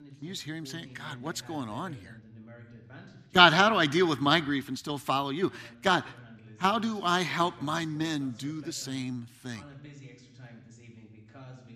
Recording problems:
voice in the background; faint; throughout; 25 dB below the speech

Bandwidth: 14.5 kHz